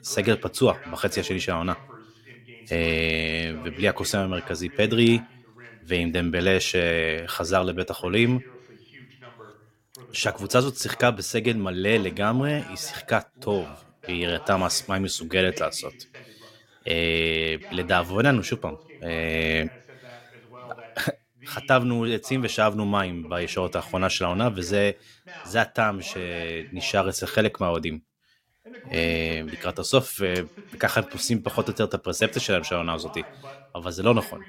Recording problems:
voice in the background; noticeable; throughout; 20 dB below the speech

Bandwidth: 16.5 kHz